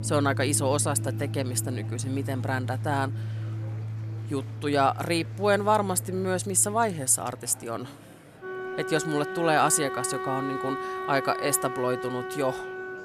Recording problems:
background music; loud; throughout; 7 dB below the speech
murmuring crowd; faint; throughout; 25 dB below the speech

